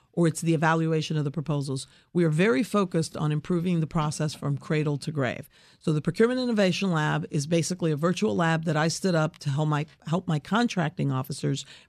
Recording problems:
none

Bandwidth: 14 kHz